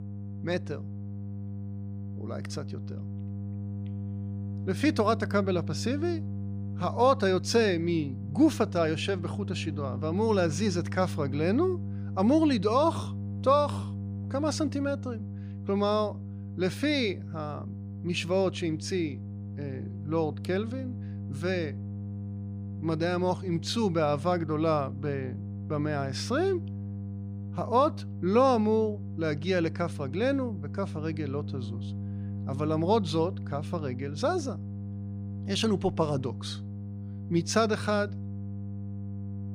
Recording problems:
electrical hum; noticeable; throughout; 50 Hz, 20 dB below the speech

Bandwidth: 15 kHz